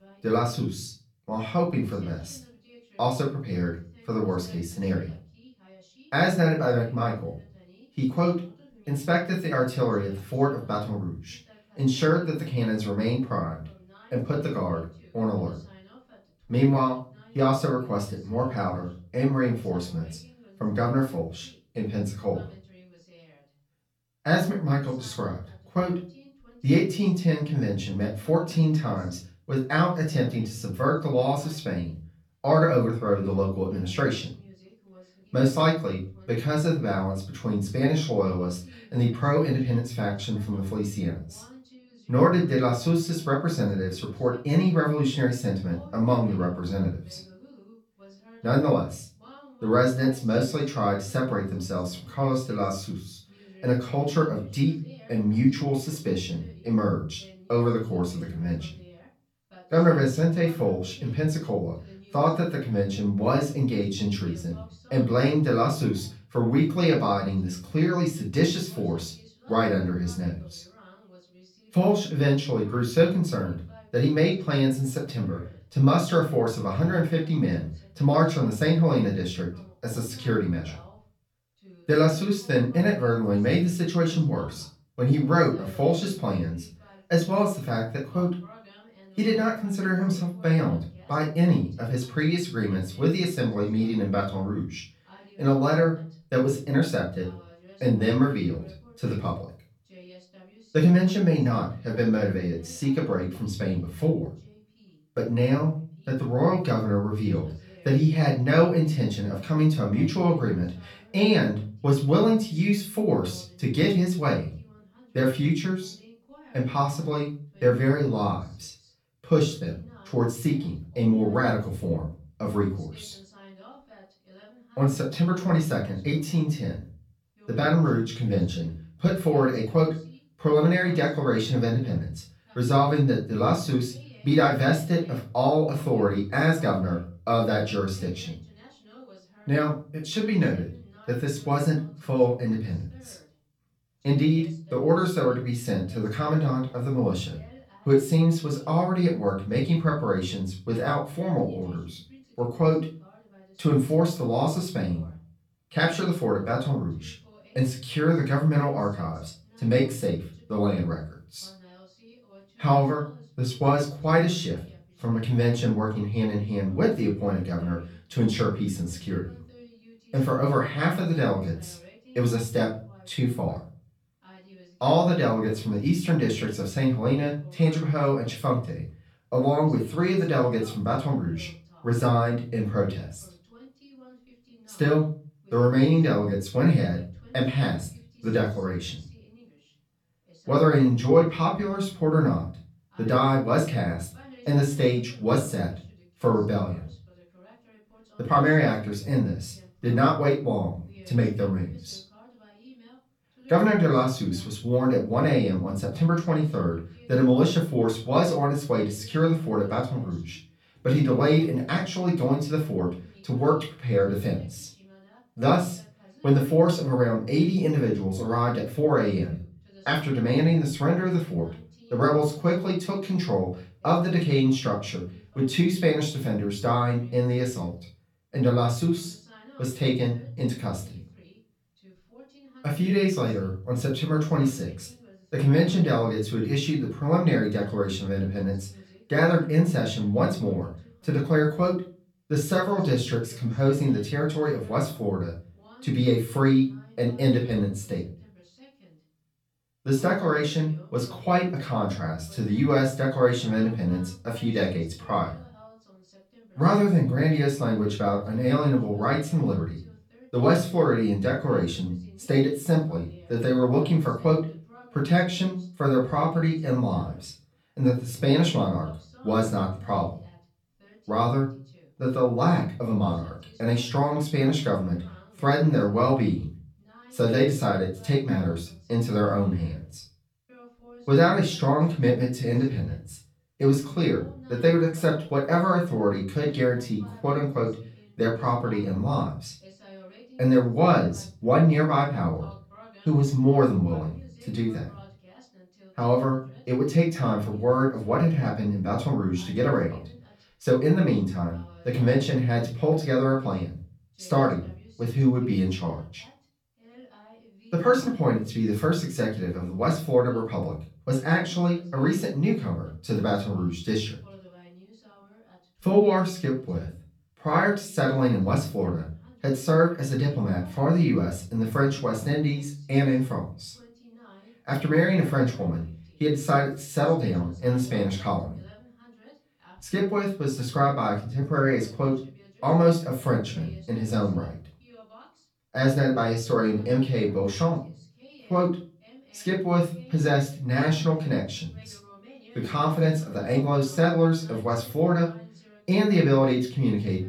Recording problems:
off-mic speech; far
room echo; slight; dies away in 0.3 s
voice in the background; faint; throughout; 30 dB below the speech

